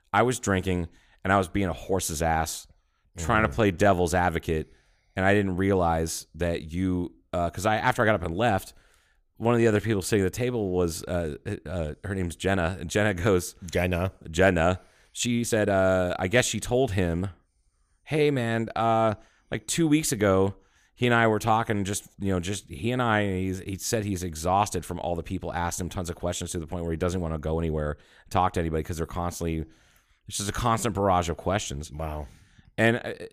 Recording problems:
uneven, jittery; strongly; from 3 to 16 s

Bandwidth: 15 kHz